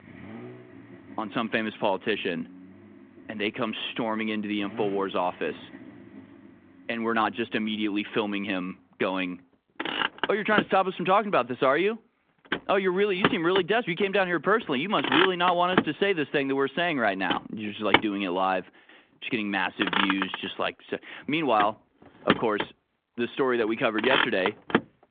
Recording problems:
phone-call audio
traffic noise; loud; throughout; 2 dB below the speech

